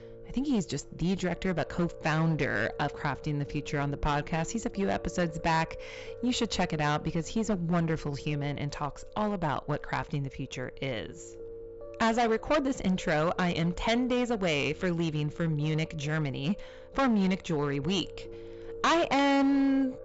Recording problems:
distortion; heavy; 7% of the sound clipped
high frequencies cut off; noticeable; nothing above 7.5 kHz
background music; noticeable; throughout; 15 dB below the speech

